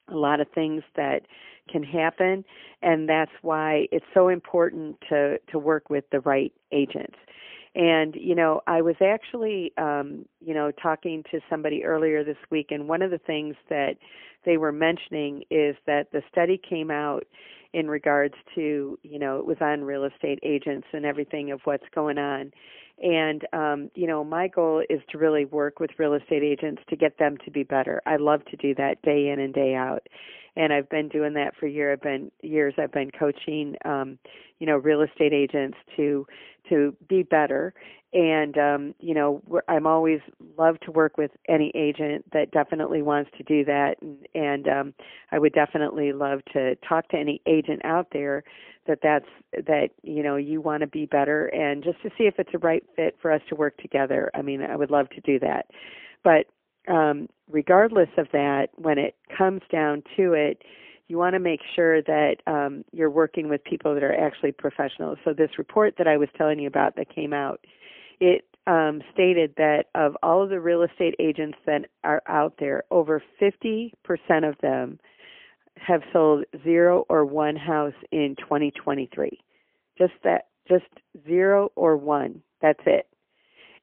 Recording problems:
phone-call audio; poor line; nothing above 3 kHz

